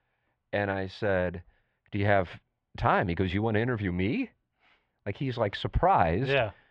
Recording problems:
muffled; very; fading above 3 kHz

